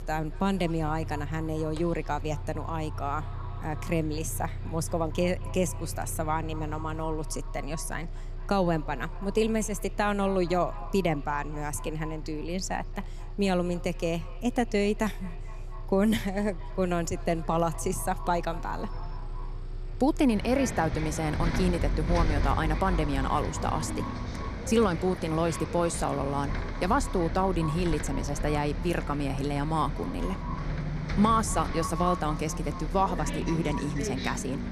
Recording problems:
echo of what is said; noticeable; throughout; 230 ms later, 15 dB below the speech
traffic noise; loud; throughout; 7 dB below the speech

